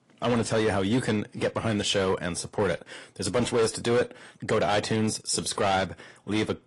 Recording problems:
distortion; slight; 8% of the sound clipped
garbled, watery; slightly; nothing above 11 kHz

